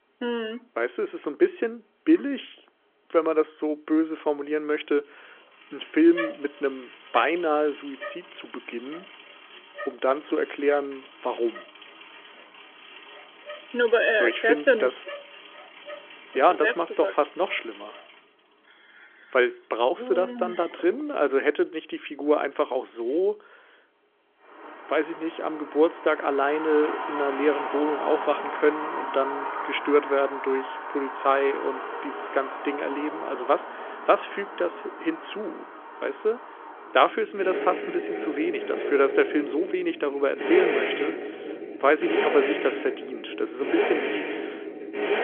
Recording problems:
phone-call audio; nothing above 3.5 kHz
traffic noise; loud; throughout; 8 dB below the speech

